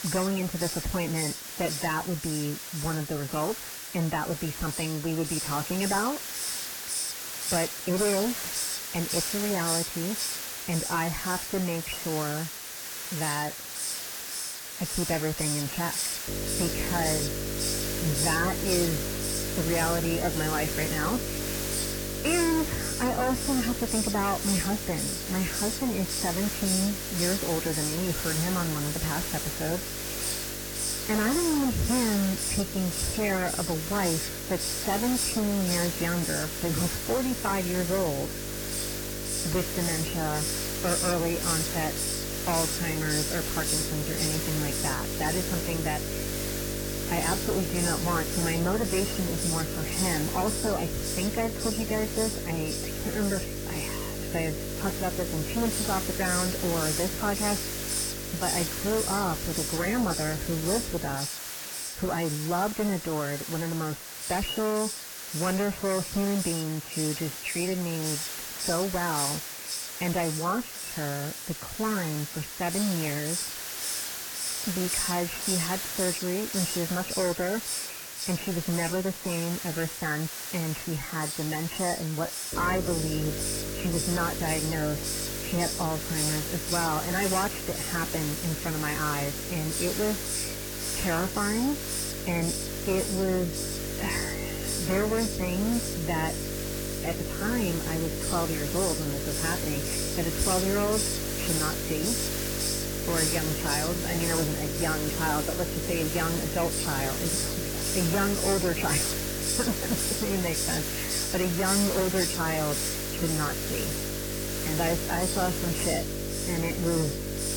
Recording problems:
distortion; heavy; 13% of the sound clipped
garbled, watery; badly; nothing above 3 kHz
electrical hum; loud; from 16 s to 1:01 and from 1:23 on; 50 Hz, 9 dB below the speech
hiss; loud; throughout; 1 dB below the speech

